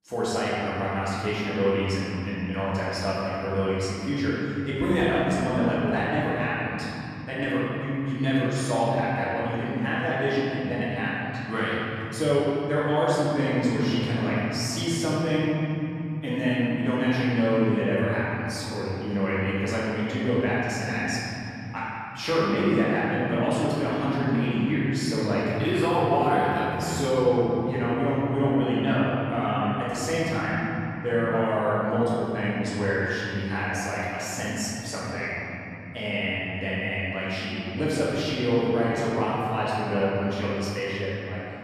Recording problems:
room echo; strong; dies away in 3 s
off-mic speech; far

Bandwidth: 14 kHz